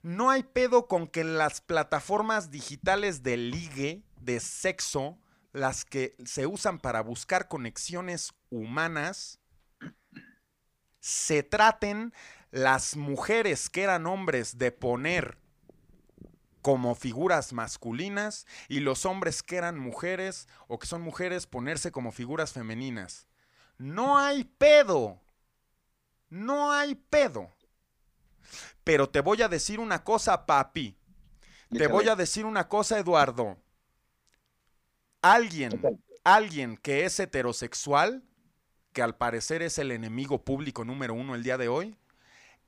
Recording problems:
none

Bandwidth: 15 kHz